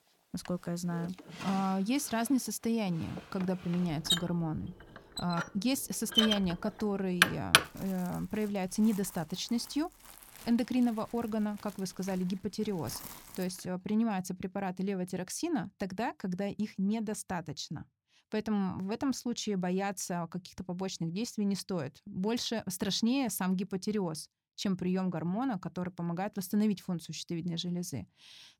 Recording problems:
household noises; very loud; until 14 s; 3 dB above the speech

